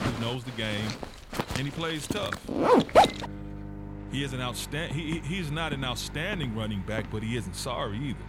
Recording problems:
household noises; very loud; throughout; 4 dB above the speech
footsteps; noticeable; from 5 to 7.5 s; peak 9 dB below the speech

